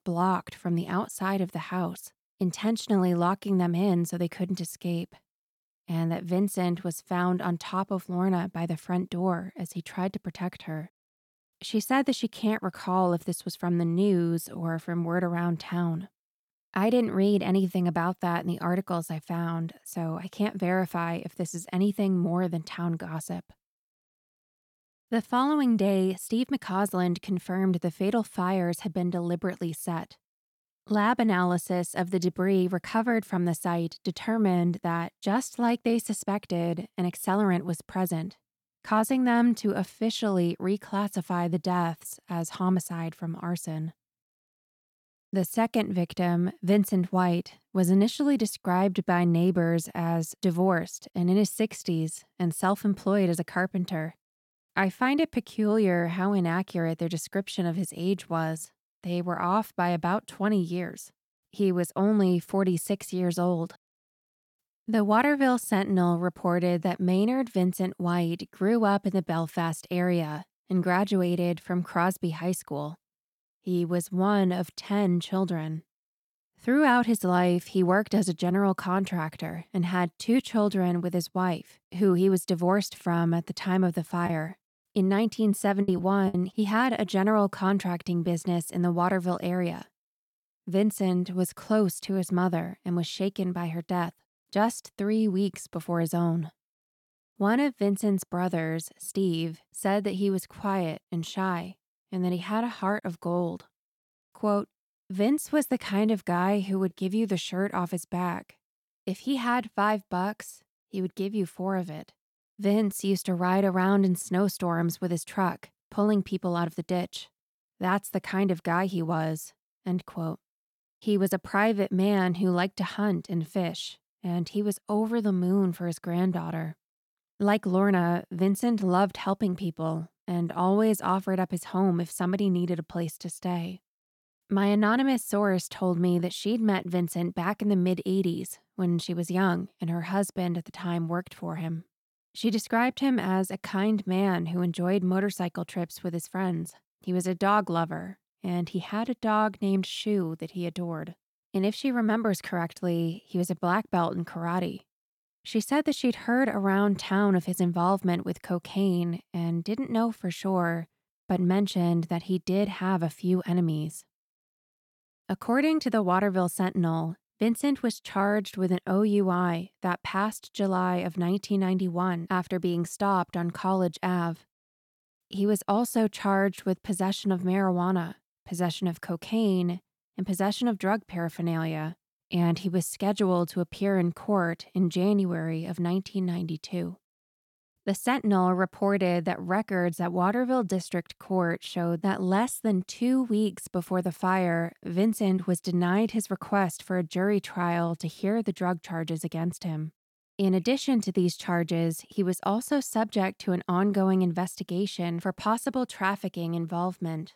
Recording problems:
choppy; very; from 1:24 to 1:26; 5% of the speech affected

